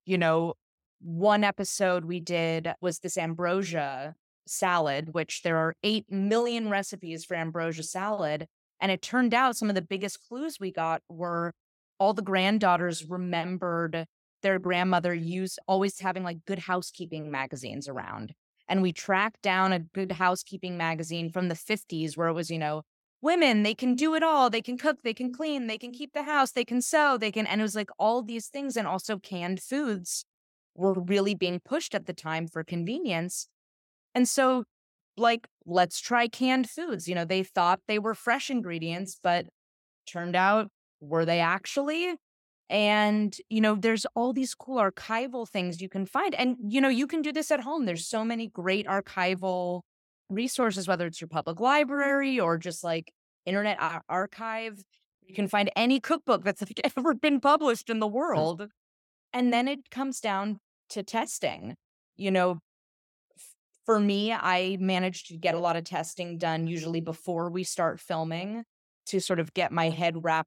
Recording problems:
none

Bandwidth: 17 kHz